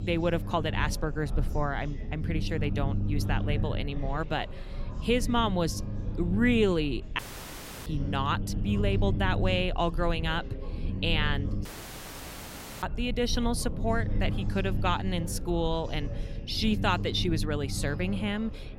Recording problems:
chatter from many people; noticeable; throughout; 20 dB below the speech
low rumble; noticeable; throughout; 15 dB below the speech
audio cutting out; at 7 s for 0.5 s and at 12 s for 1 s

